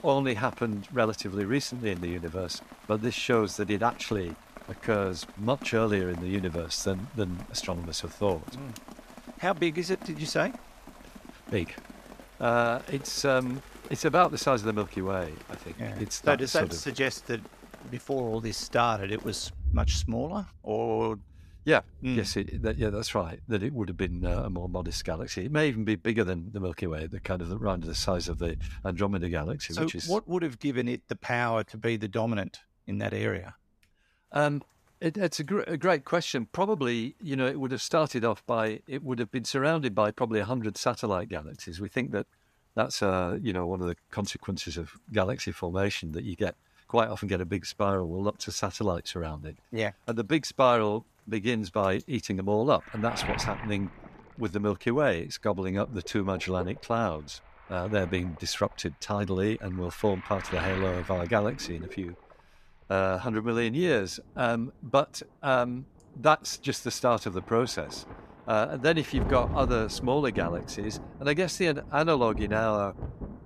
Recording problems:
rain or running water; noticeable; throughout; 15 dB below the speech

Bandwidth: 14.5 kHz